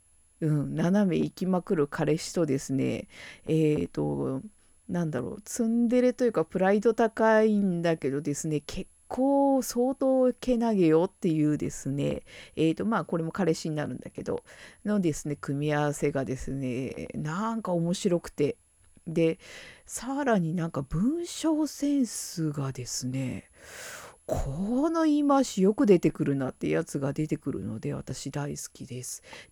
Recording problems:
high-pitched whine; faint; throughout; 11 kHz, 35 dB below the speech

